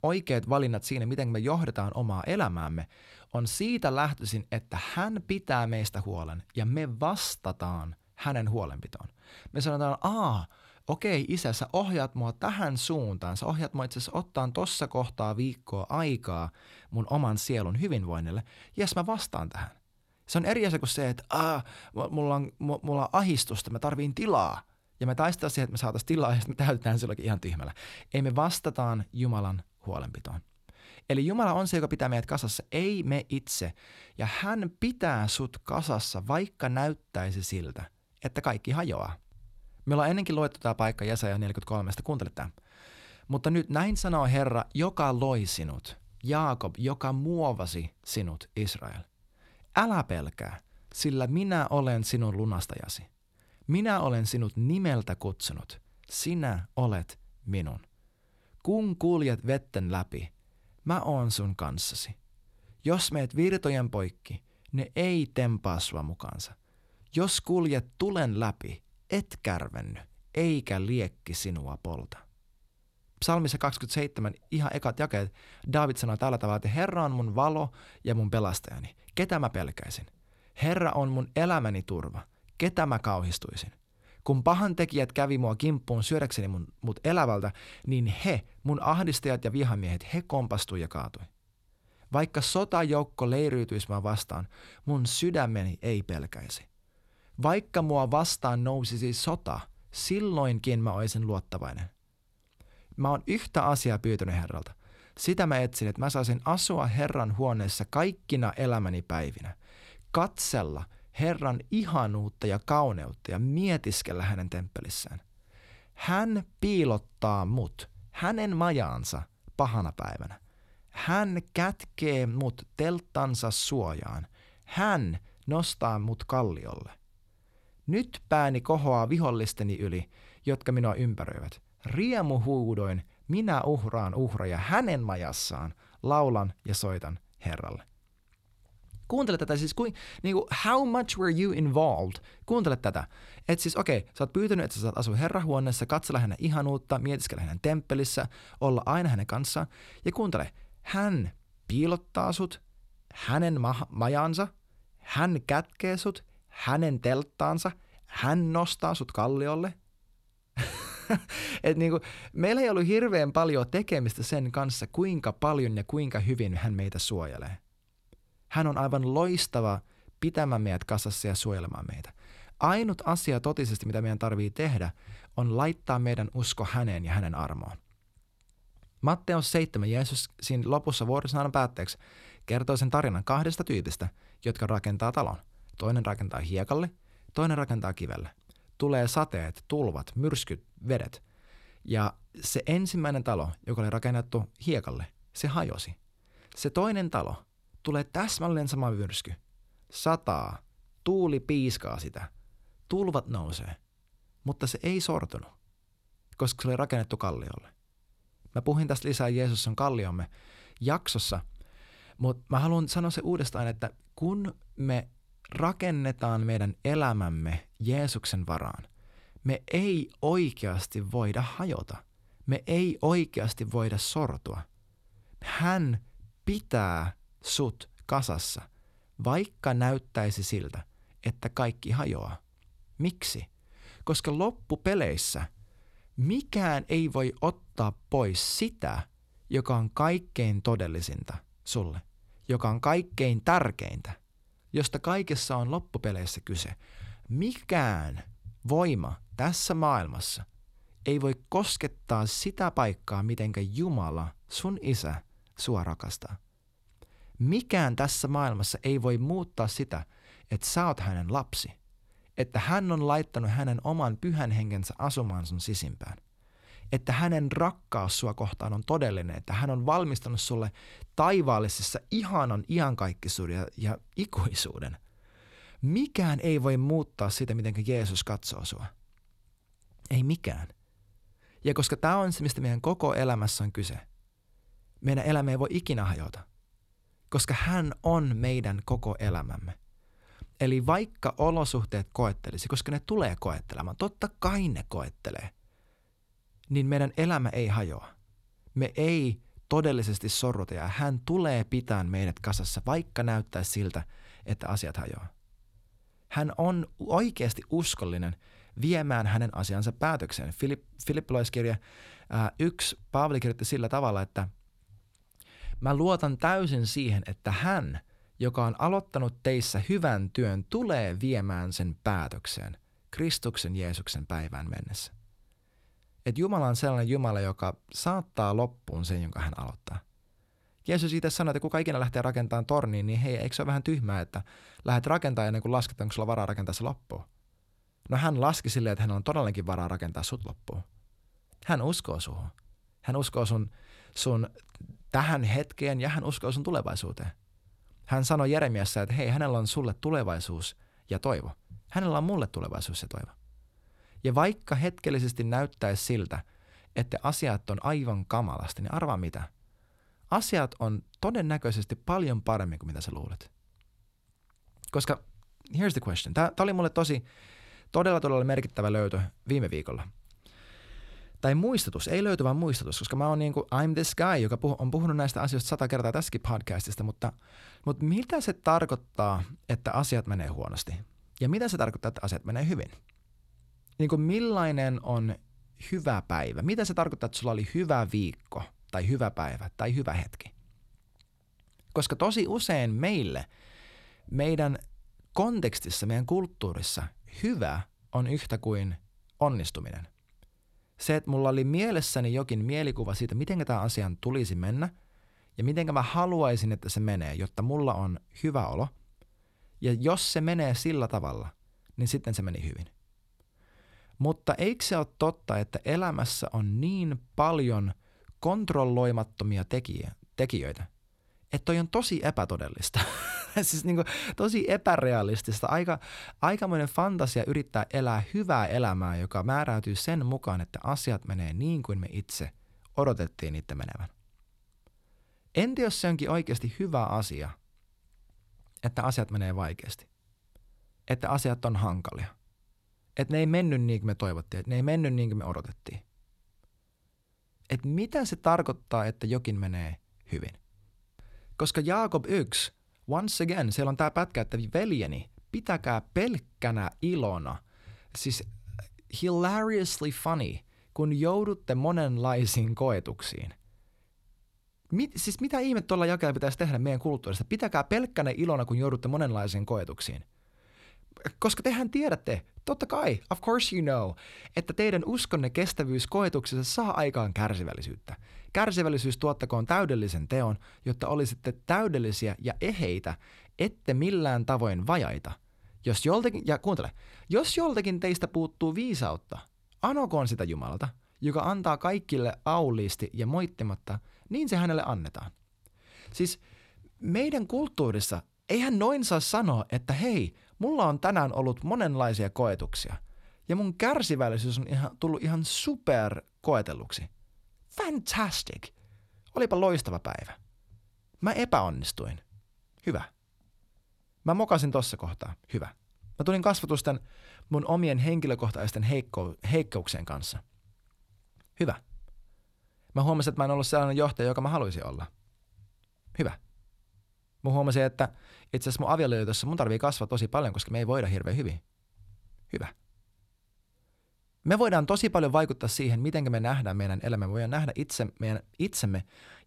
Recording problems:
none

